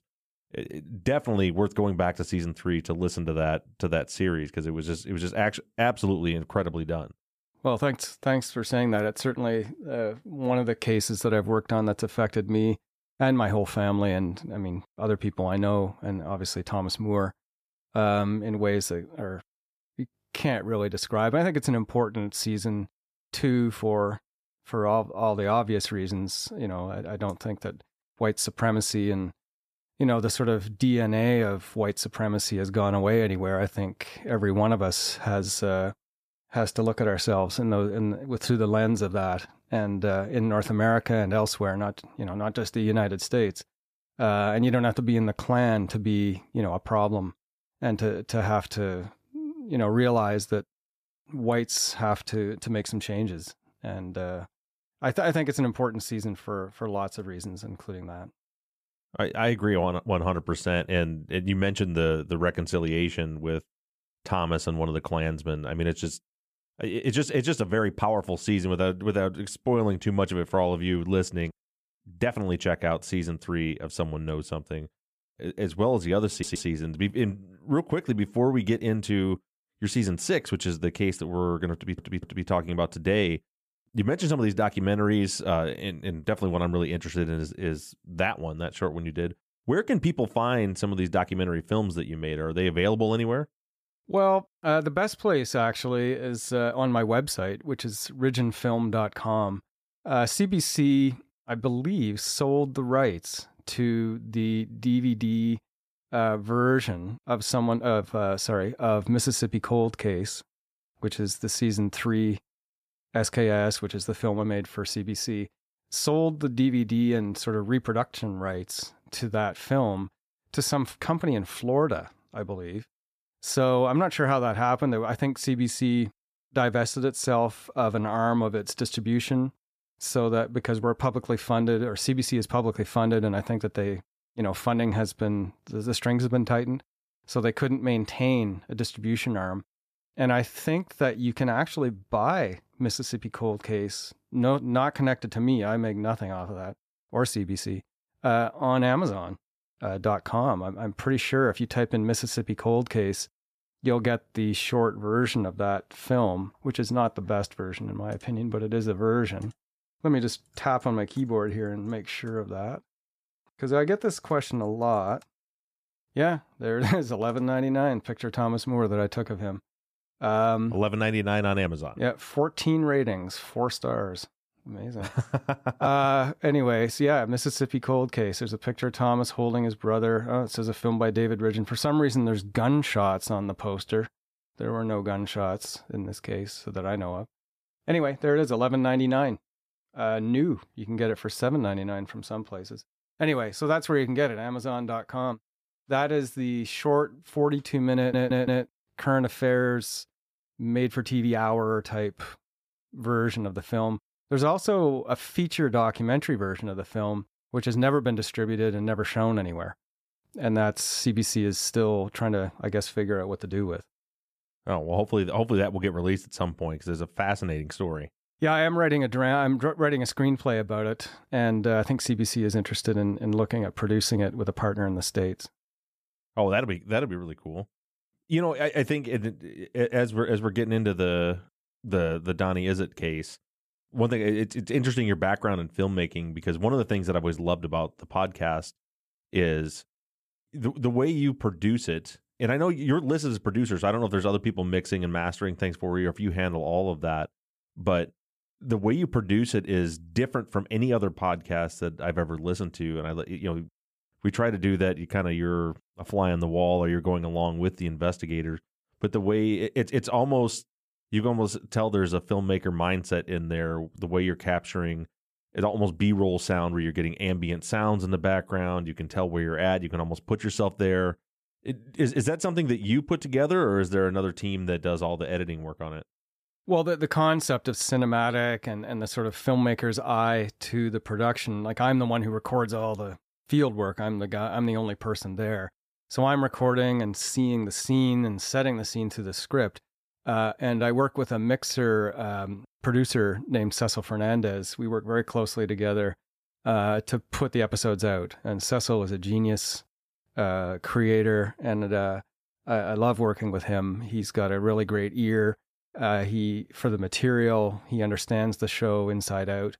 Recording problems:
audio stuttering; at 1:16, at 1:22 and at 3:18

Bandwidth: 14.5 kHz